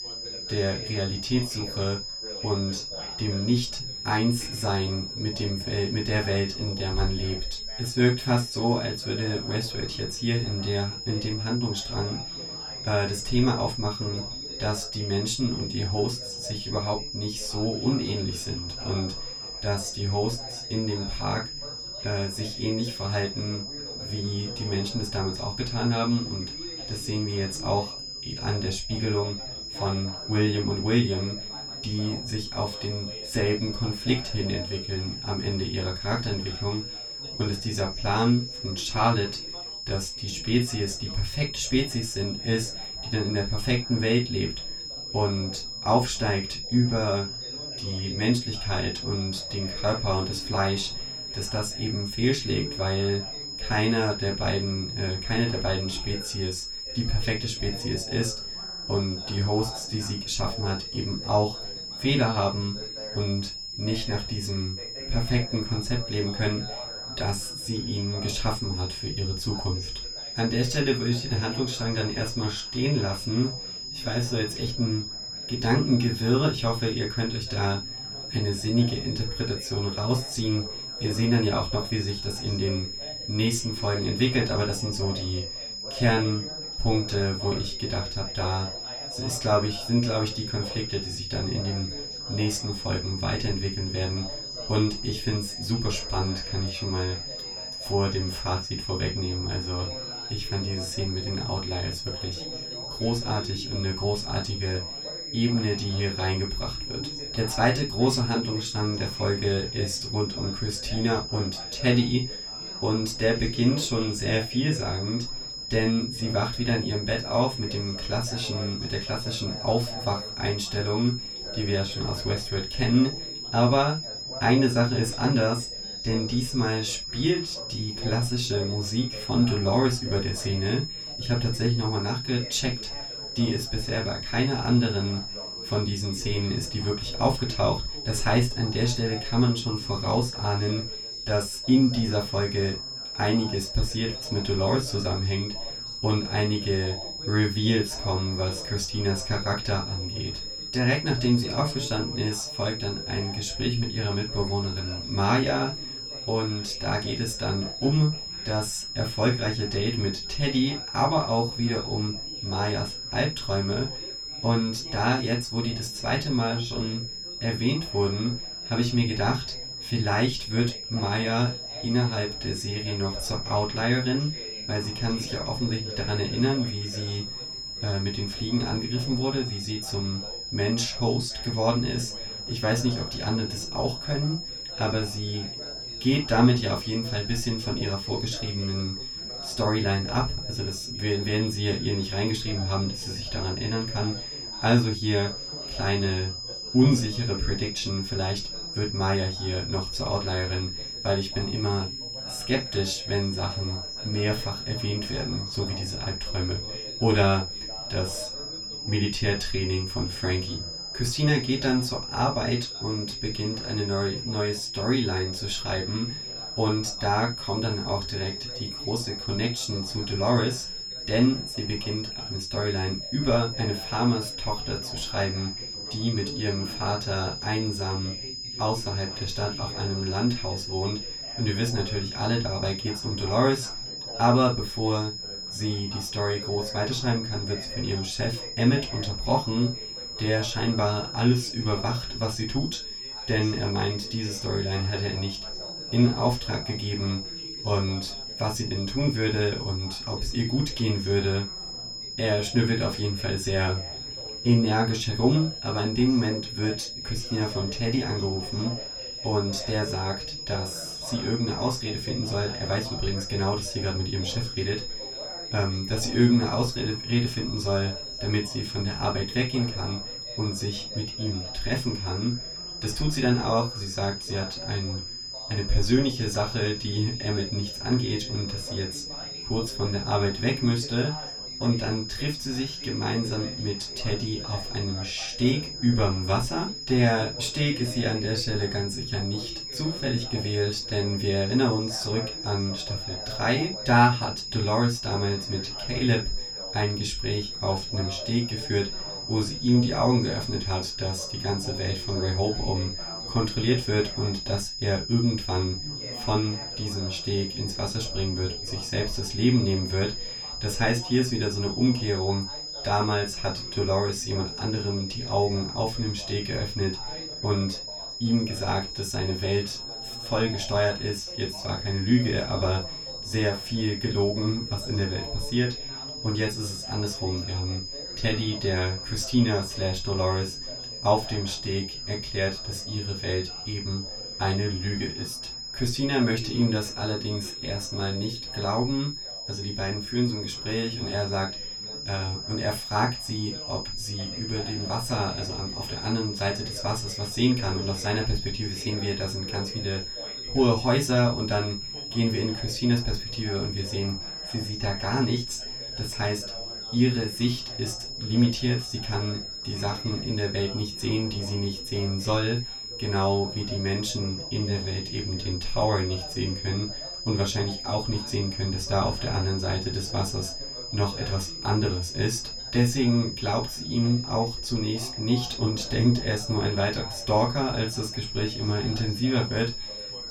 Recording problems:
off-mic speech; far
room echo; slight; dies away in 0.2 s
high-pitched whine; loud; throughout; 5 kHz, 6 dB below the speech
background chatter; noticeable; throughout; 4 voices, 20 dB below the speech

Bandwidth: 19 kHz